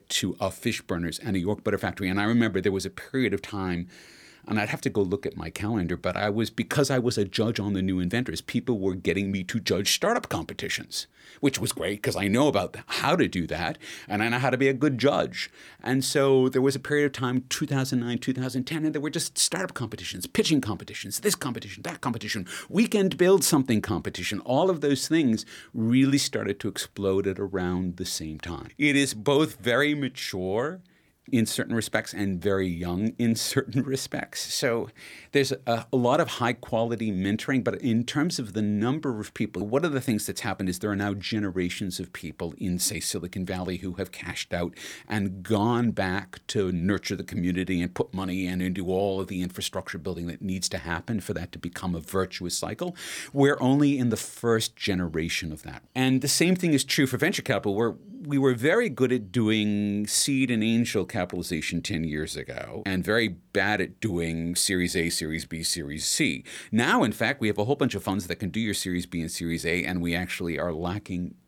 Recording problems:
none

